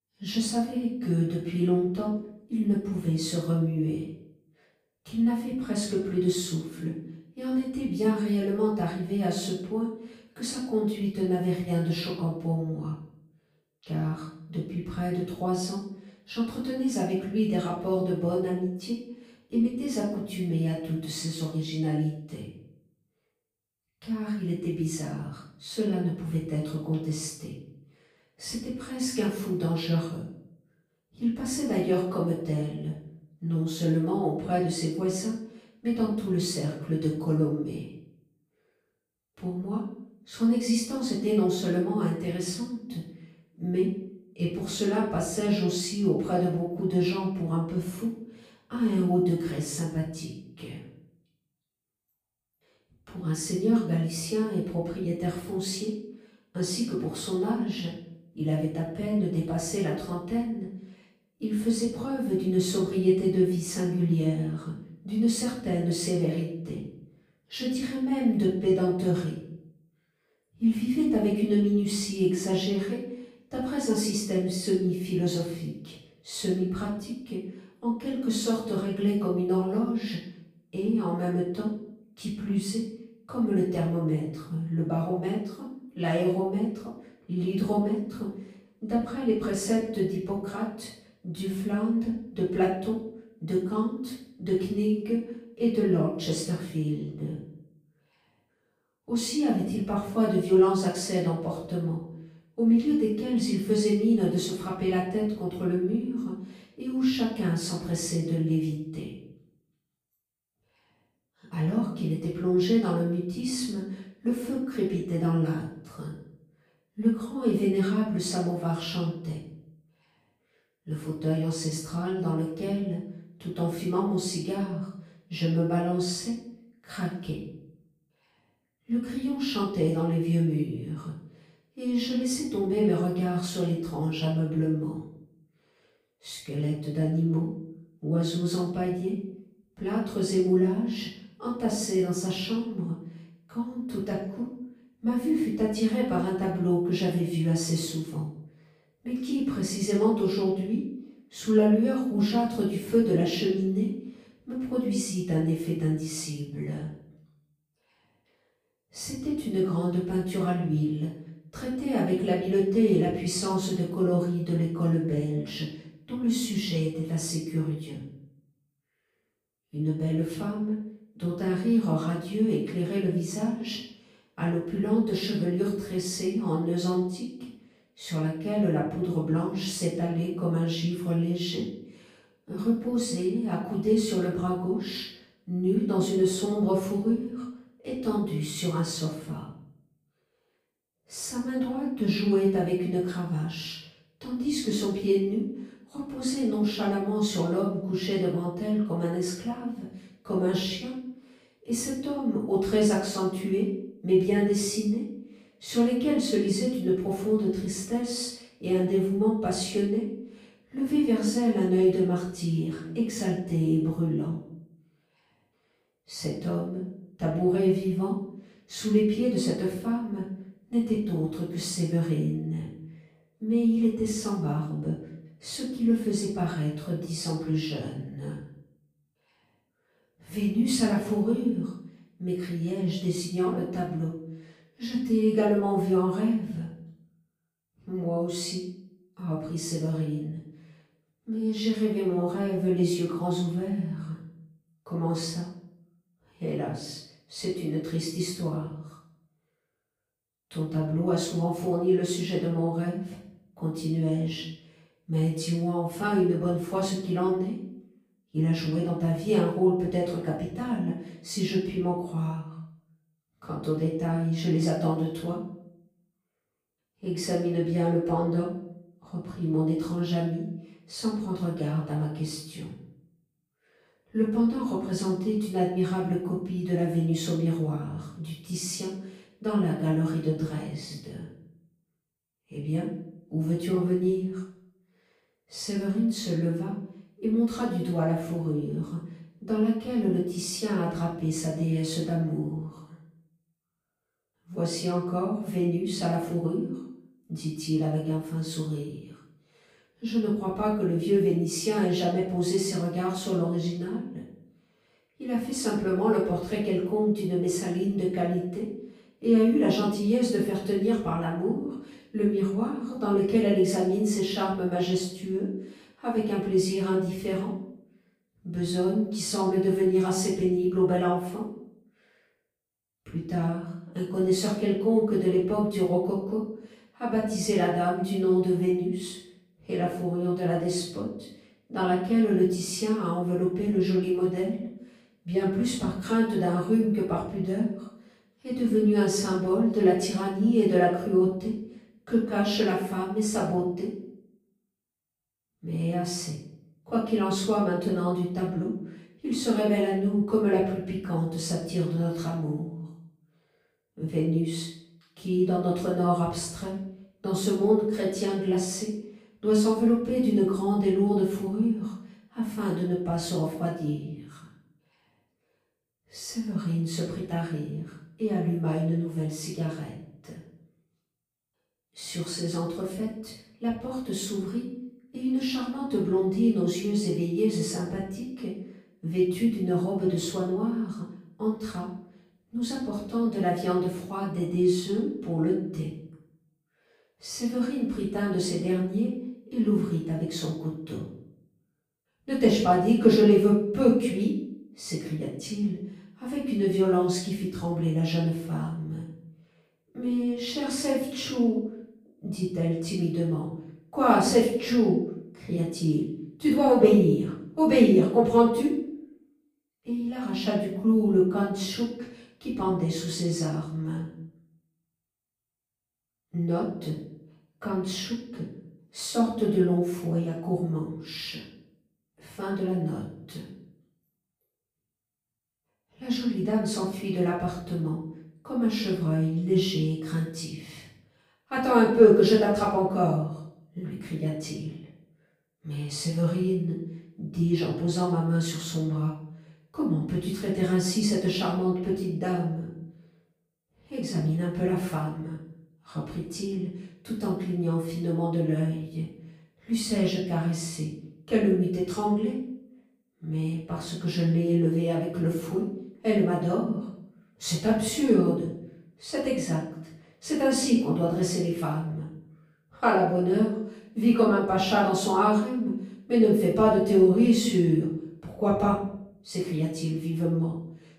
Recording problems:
off-mic speech; far
room echo; noticeable; dies away in 0.6 s

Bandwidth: 15 kHz